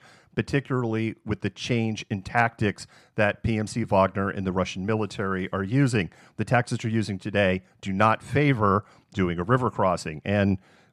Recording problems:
none

